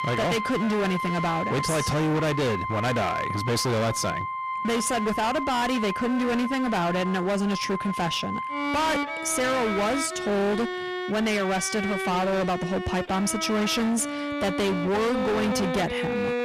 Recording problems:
distortion; heavy; 30% of the sound clipped
background music; loud; throughout; 5 dB below the speech

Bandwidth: 14.5 kHz